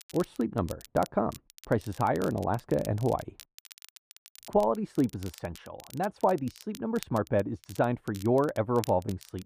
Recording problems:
muffled; very; fading above 2 kHz
crackle, like an old record; noticeable; 20 dB below the speech

